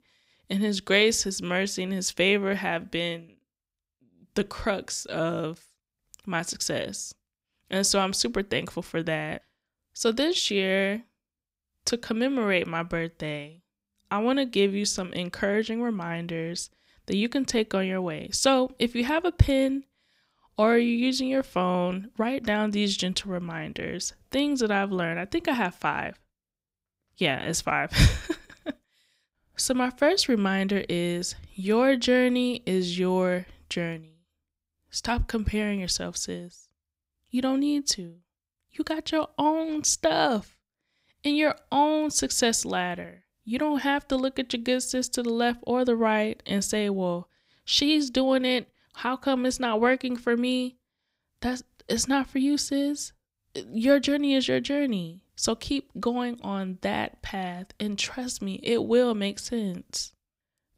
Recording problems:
none

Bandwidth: 15.5 kHz